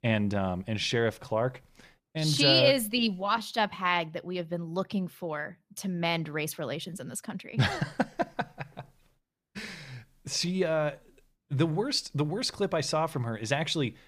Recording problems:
none

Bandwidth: 15 kHz